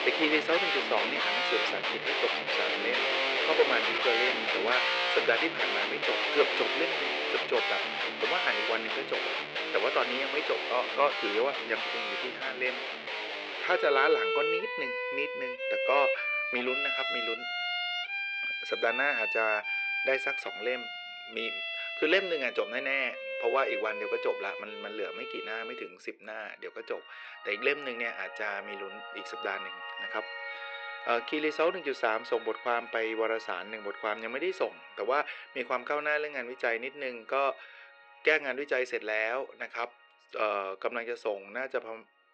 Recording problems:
thin; very; fading below 450 Hz
muffled; slightly; fading above 4 kHz
background music; very loud; throughout; 1 dB above the speech

